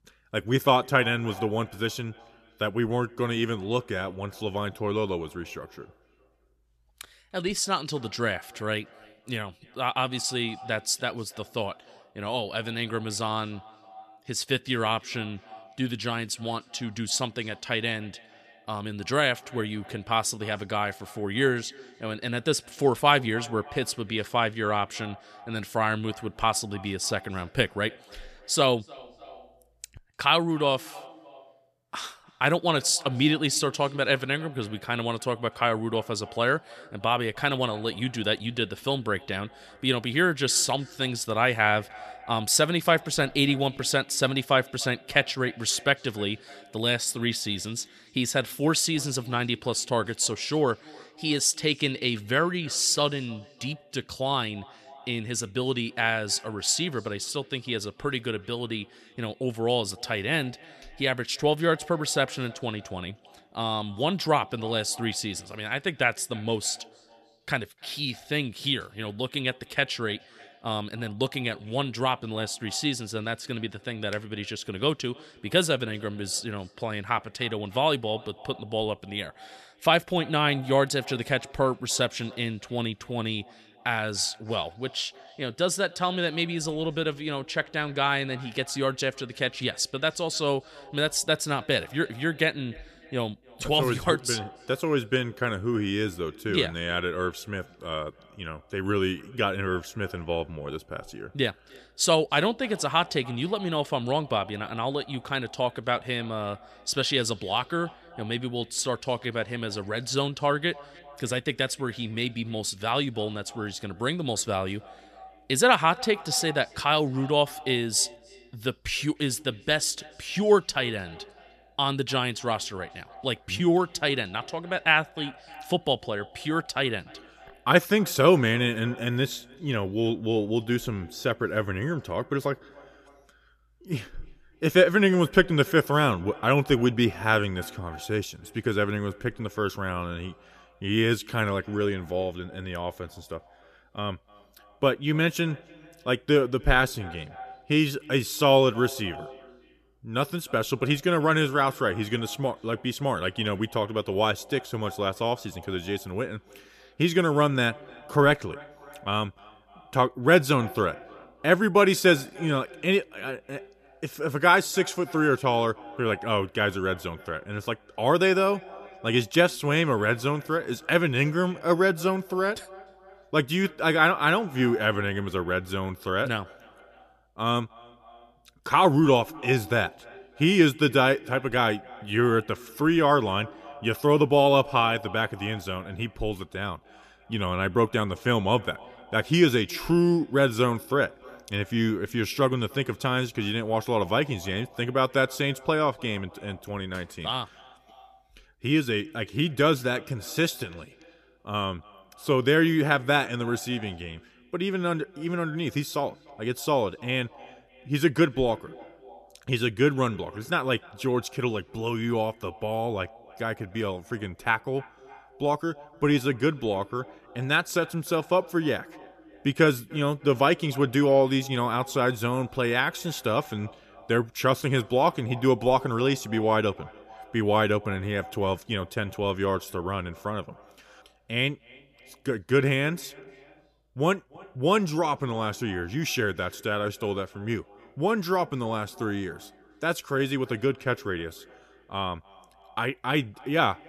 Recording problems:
echo of what is said; faint; throughout; 300 ms later, 20 dB below the speech

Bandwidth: 14.5 kHz